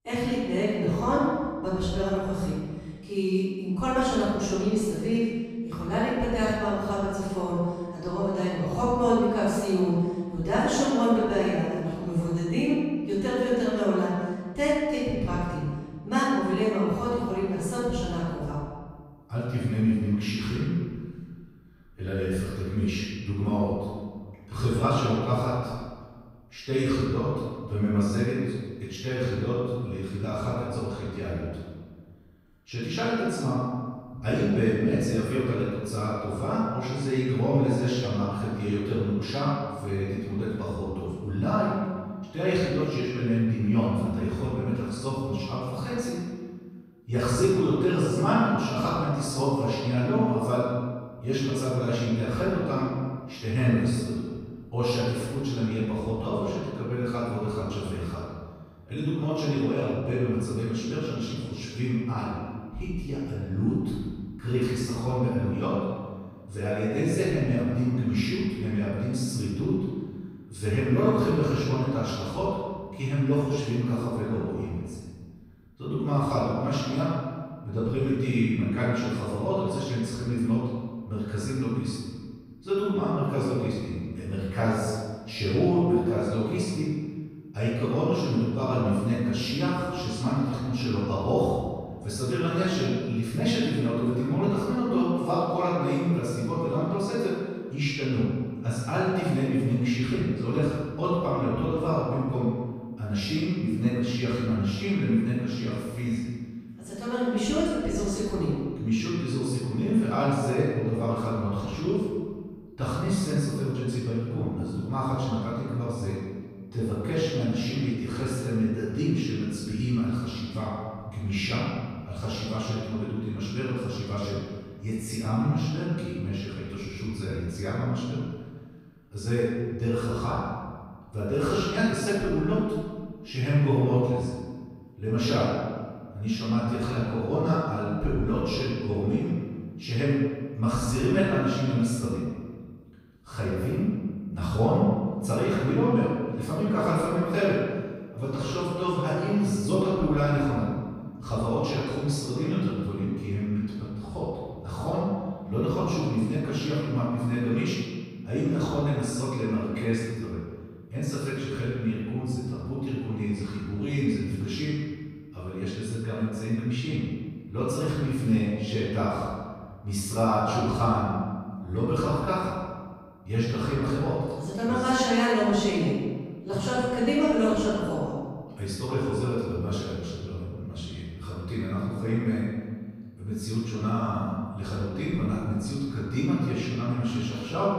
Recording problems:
room echo; strong; dies away in 1.4 s
off-mic speech; far

